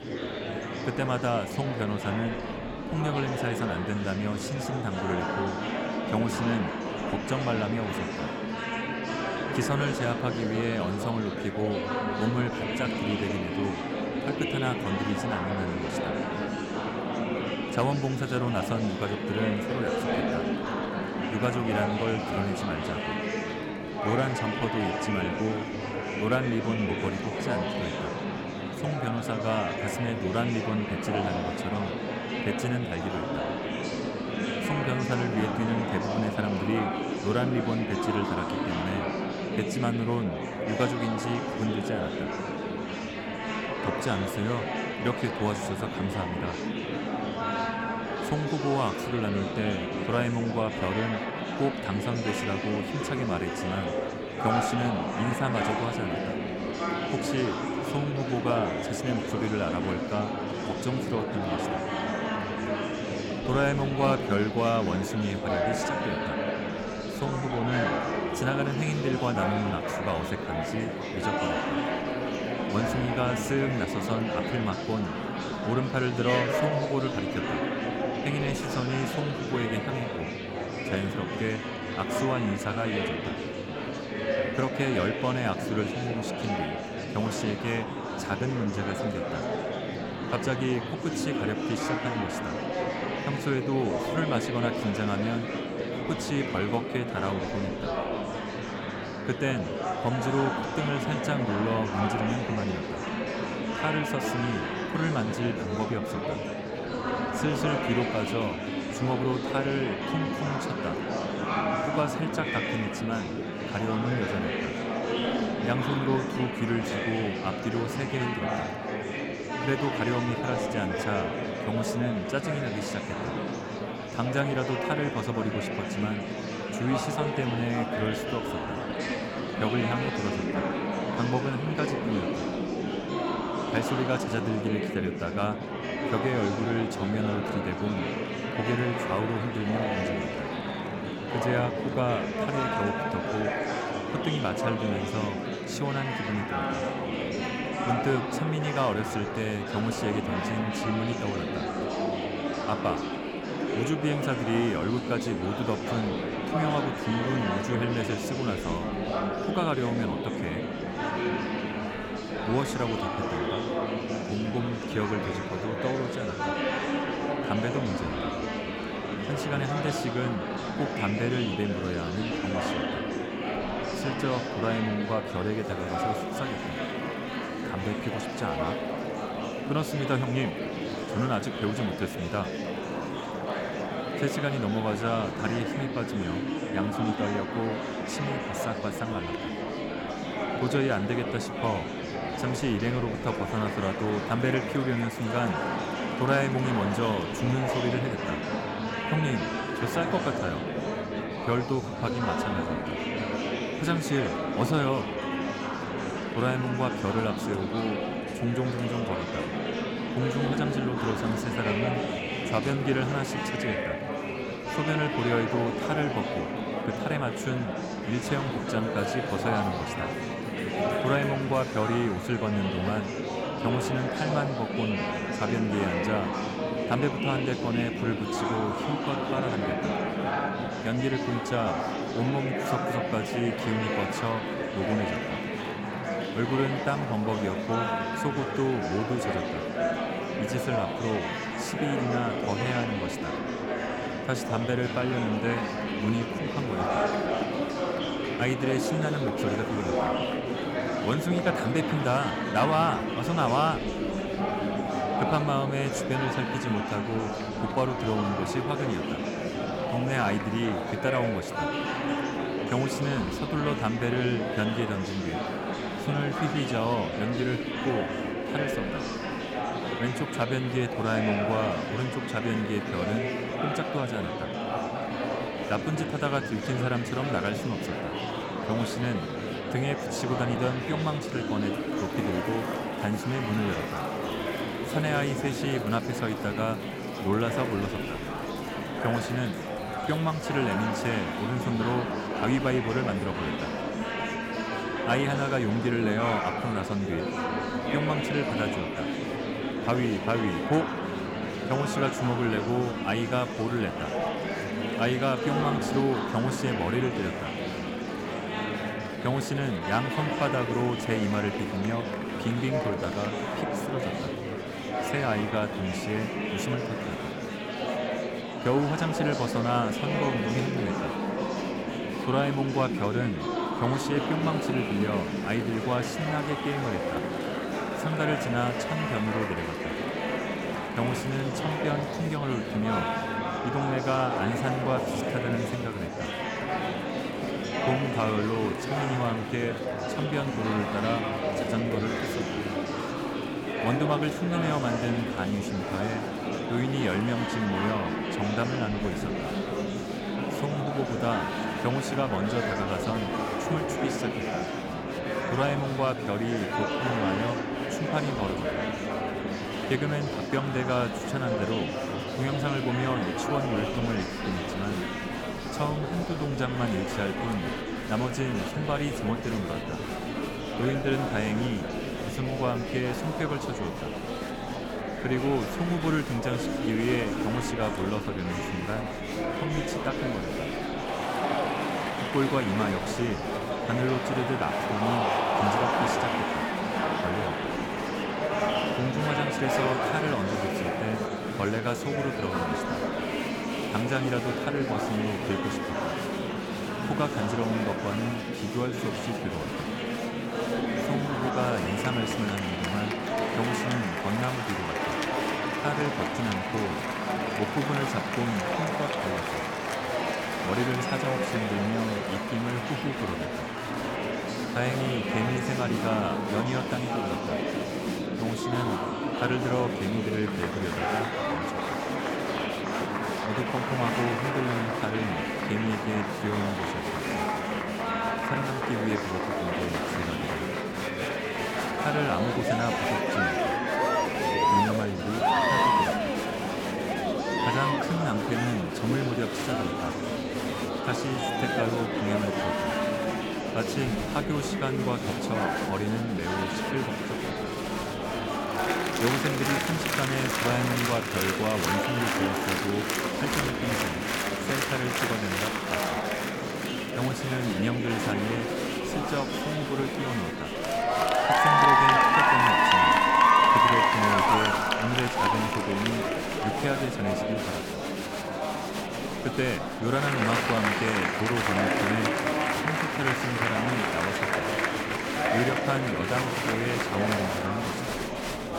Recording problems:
murmuring crowd; very loud; throughout; 1 dB above the speech

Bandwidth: 17.5 kHz